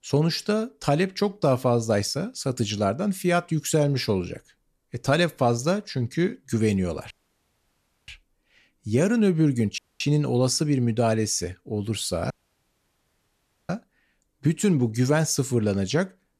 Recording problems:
audio cutting out; at 7 s for 1 s, at 10 s and at 12 s for 1.5 s

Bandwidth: 14 kHz